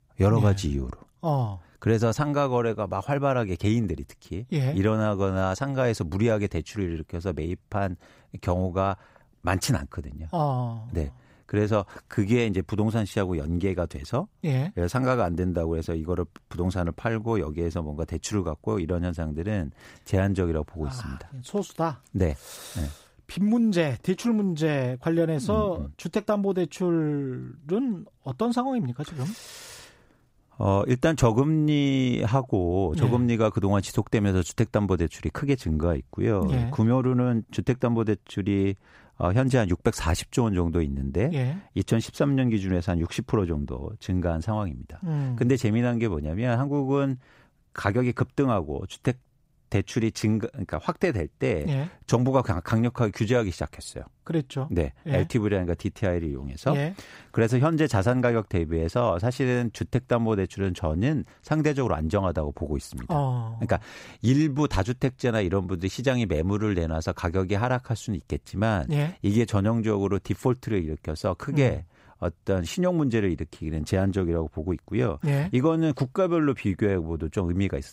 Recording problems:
none

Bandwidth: 15.5 kHz